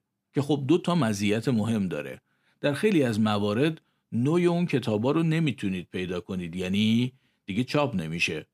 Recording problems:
none

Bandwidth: 15 kHz